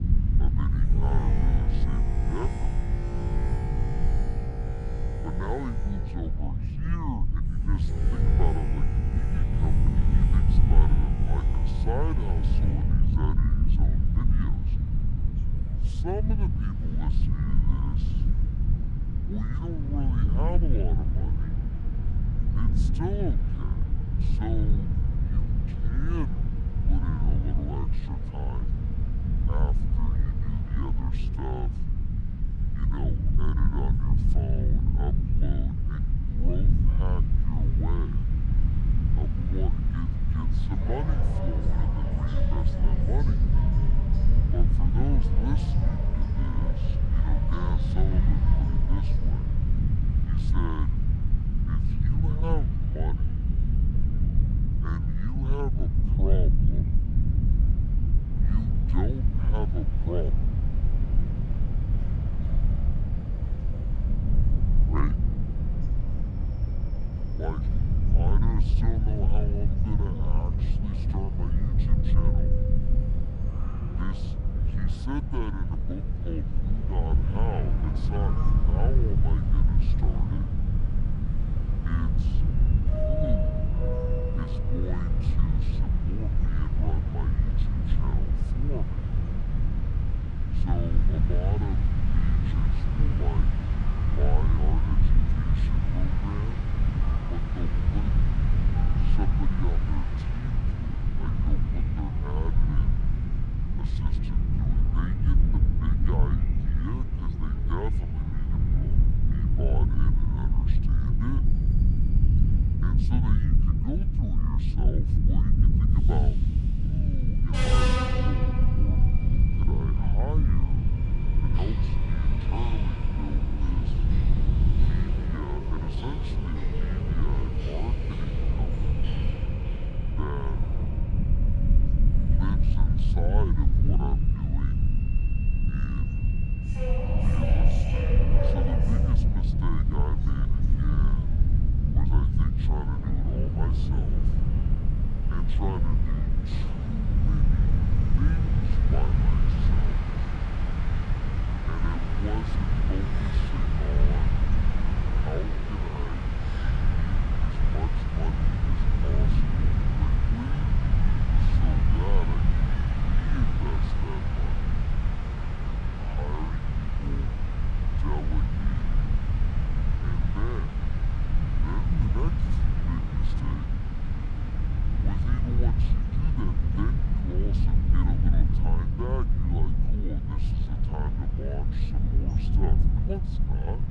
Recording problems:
wrong speed and pitch; too slow and too low; 0.6 times normal speed
train or aircraft noise; loud; throughout; 5 dB below the speech
low rumble; loud; throughout; 1 dB below the speech
voice in the background; faint; throughout; 25 dB below the speech

